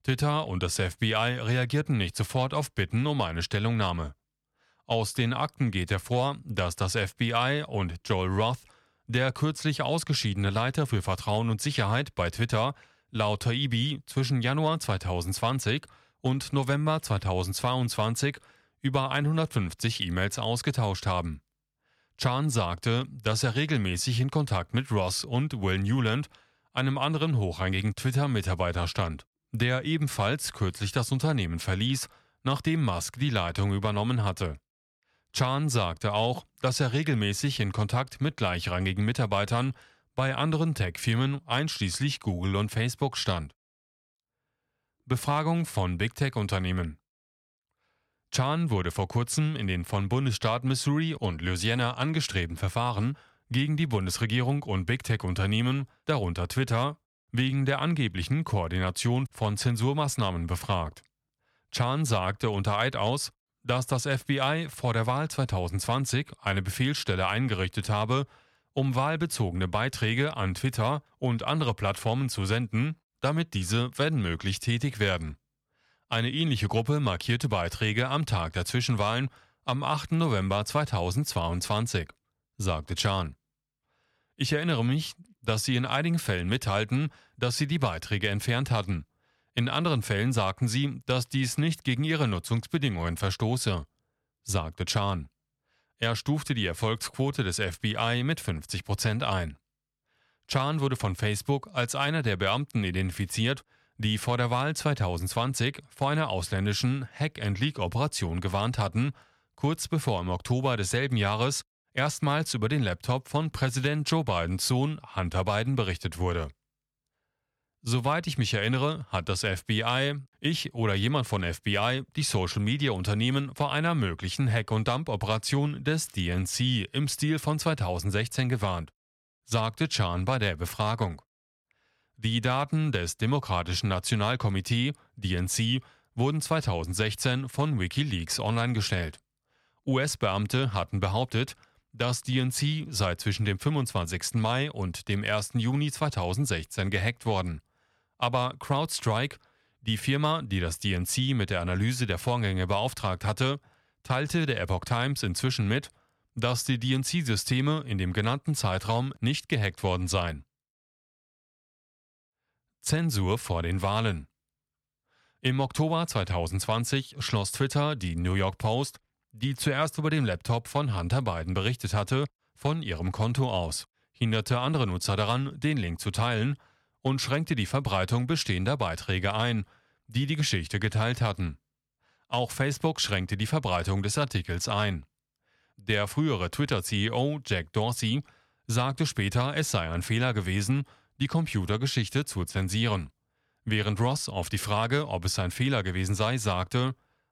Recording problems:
none

